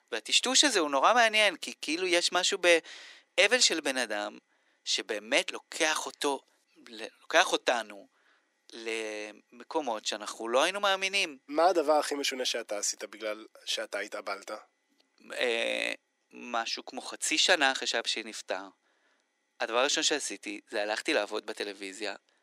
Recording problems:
thin; very; fading below 300 Hz

